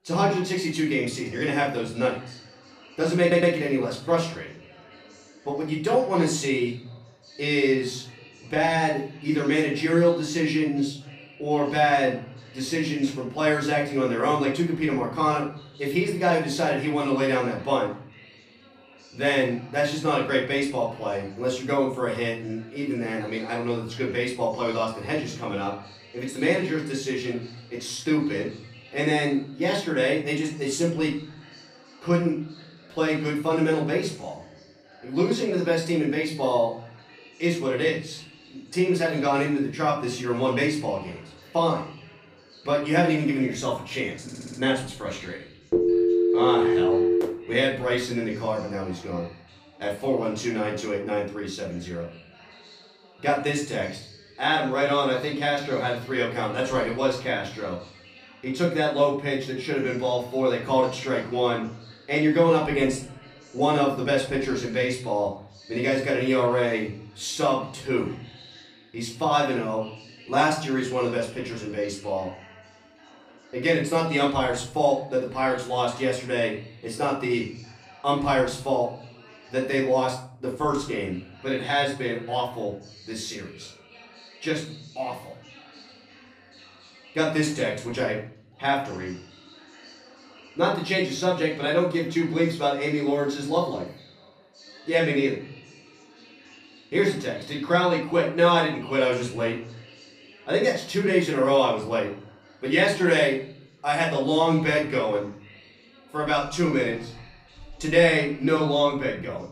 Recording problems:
off-mic speech; far
room echo; slight; dies away in 0.6 s
background chatter; faint; throughout; 3 voices, 25 dB below the speech
audio stuttering; at 3 s and at 44 s

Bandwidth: 15 kHz